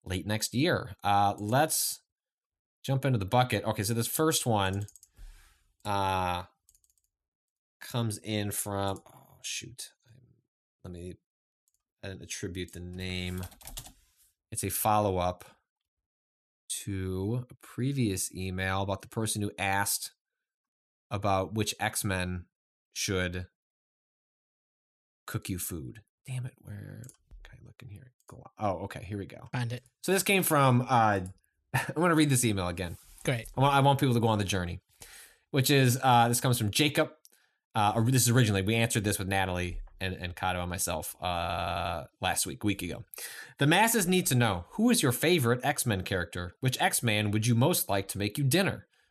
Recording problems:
audio stuttering; at 41 s

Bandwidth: 13.5 kHz